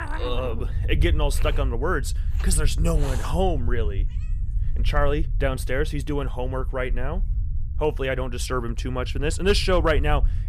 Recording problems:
animal sounds; noticeable; throughout; 15 dB below the speech
low rumble; faint; throughout; 20 dB below the speech

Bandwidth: 14.5 kHz